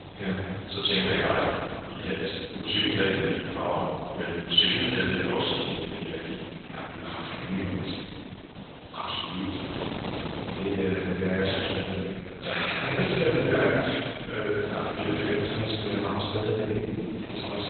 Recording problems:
room echo; strong; dies away in 2.1 s
off-mic speech; far
garbled, watery; badly; nothing above 4 kHz
echo of what is said; noticeable; throughout; 230 ms later, 15 dB below the speech
thin; very slightly; fading below 450 Hz
wind noise on the microphone; occasional gusts; 10 dB below the speech

